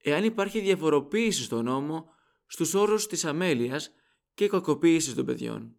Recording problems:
none

